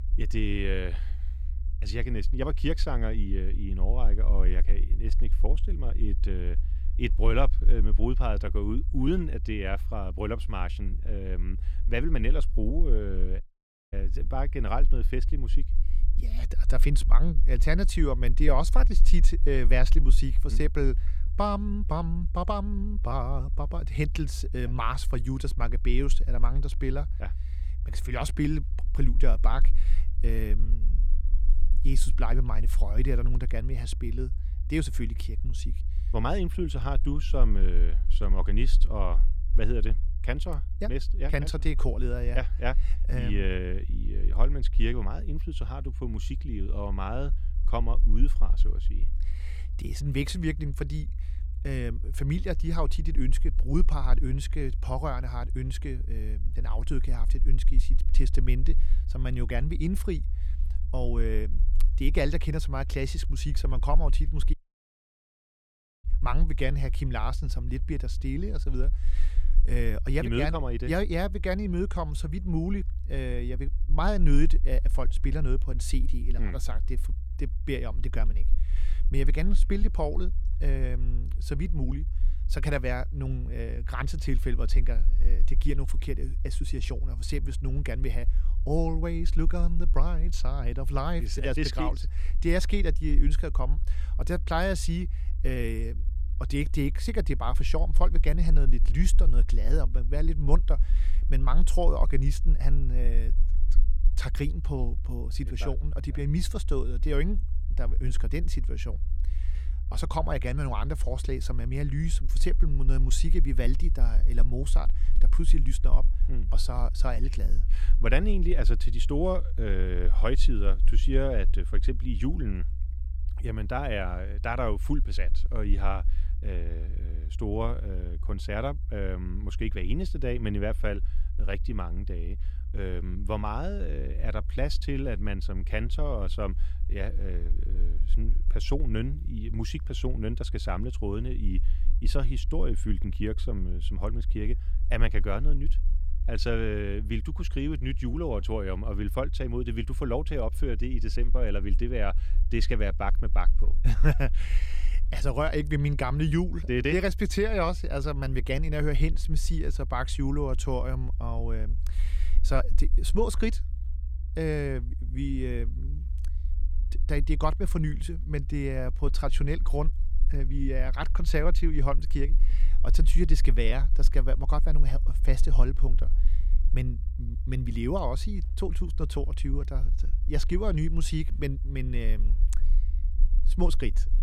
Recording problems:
low rumble; noticeable; throughout; 20 dB below the speech
audio cutting out; at 13 s for 0.5 s and at 1:05 for 1.5 s

